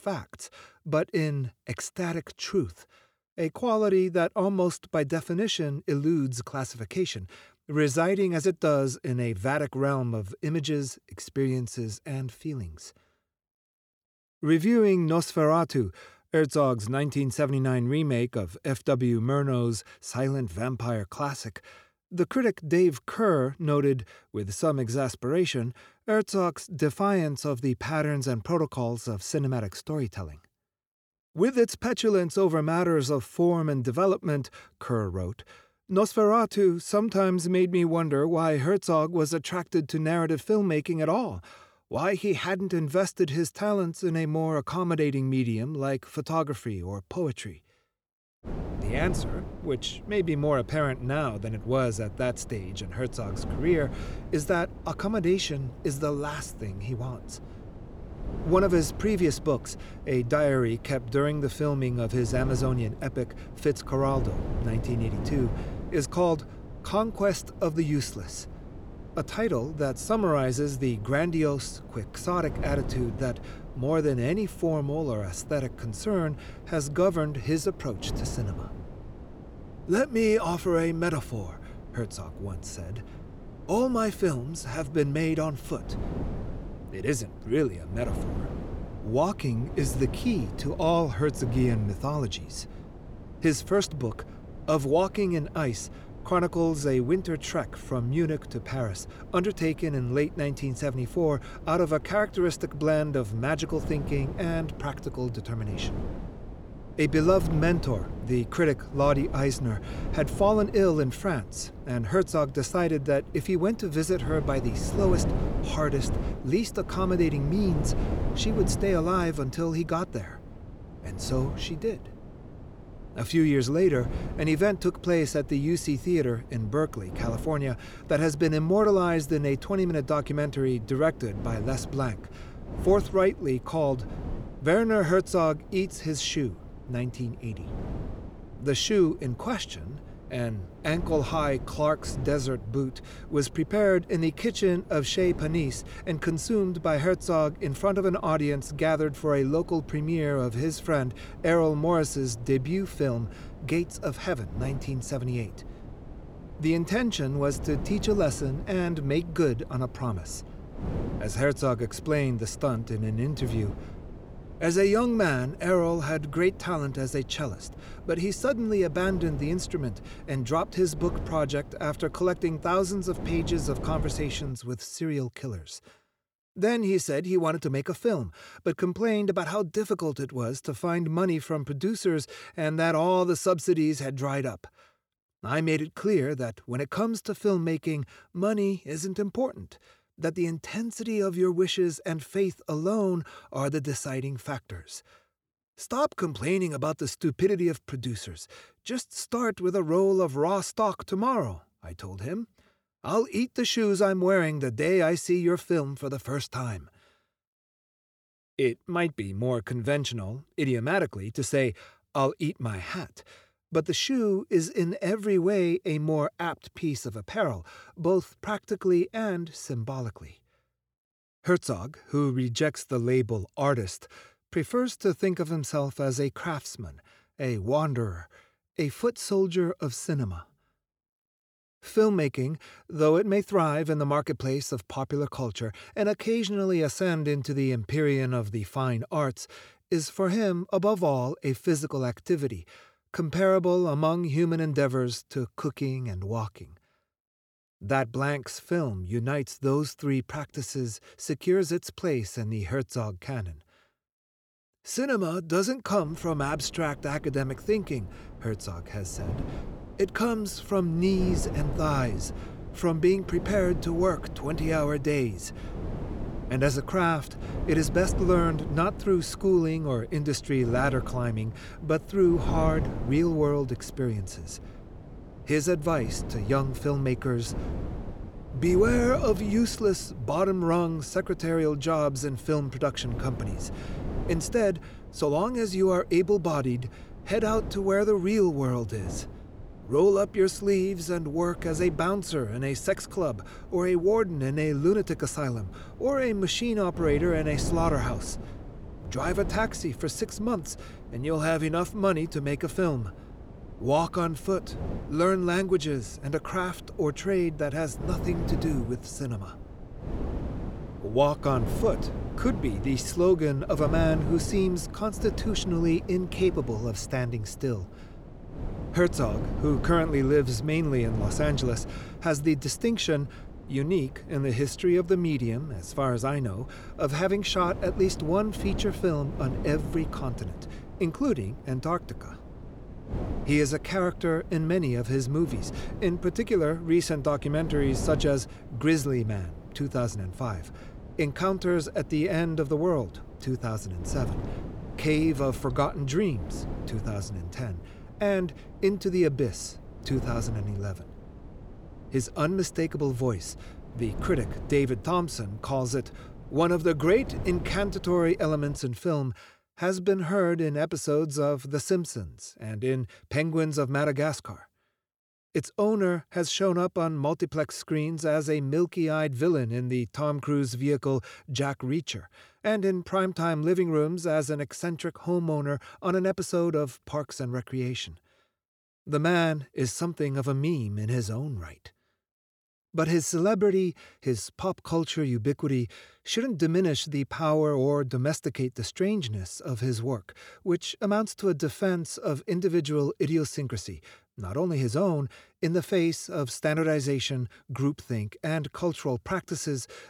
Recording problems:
wind noise on the microphone; occasional gusts; from 48 s to 2:55 and from 4:16 to 5:59; 15 dB below the speech

